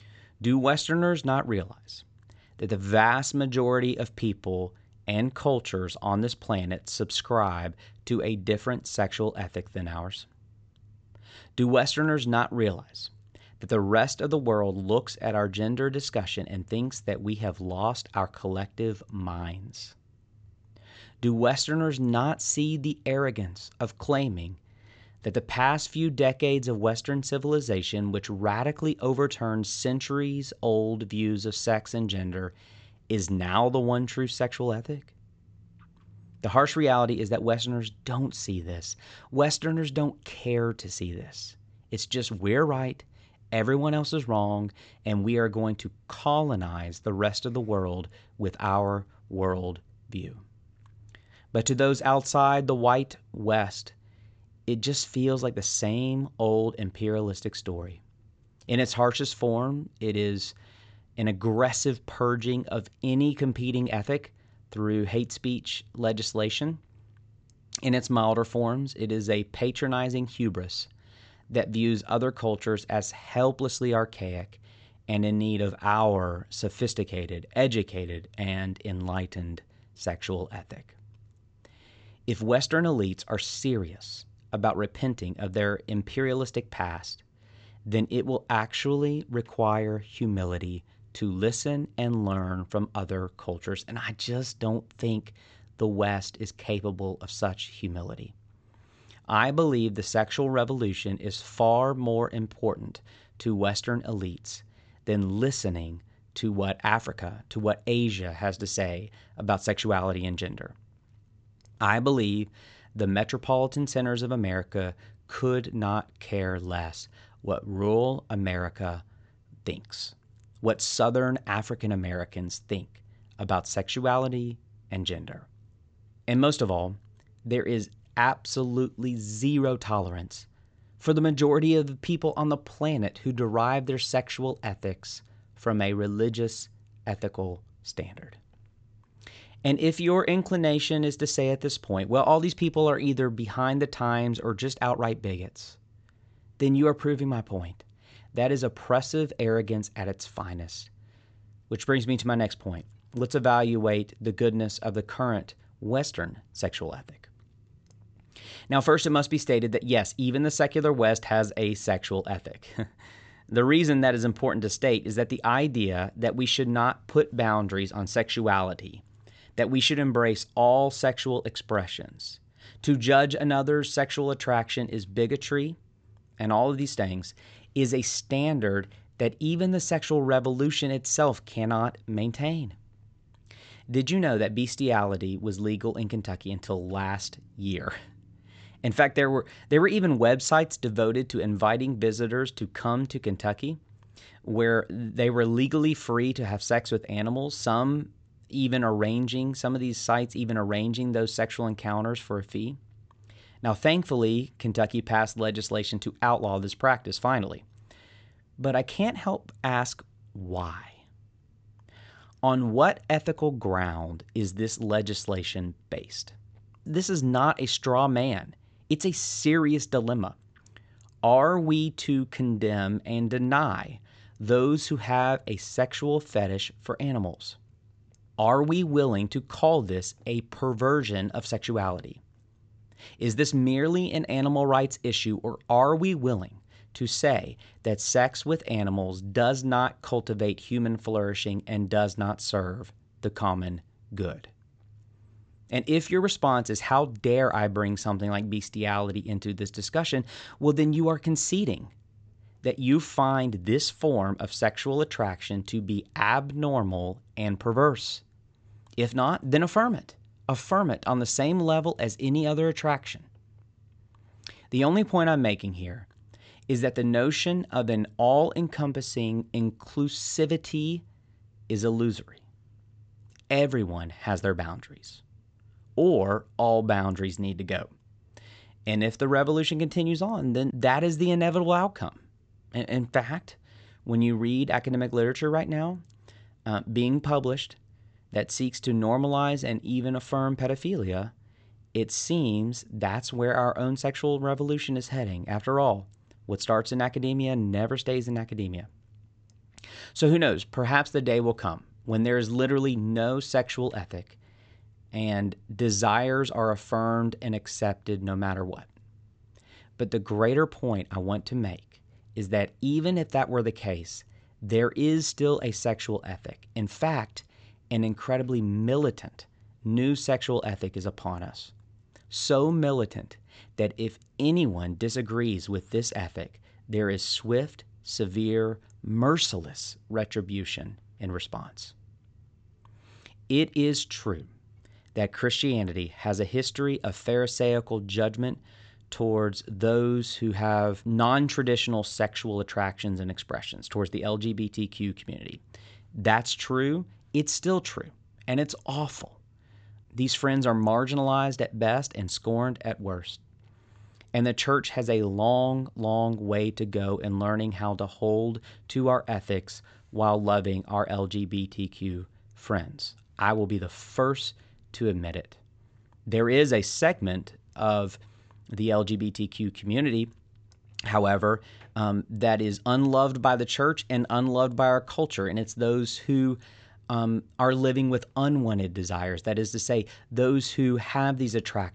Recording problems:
high frequencies cut off; noticeable; nothing above 8 kHz

